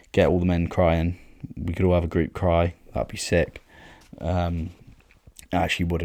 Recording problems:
abrupt cut into speech; at the end

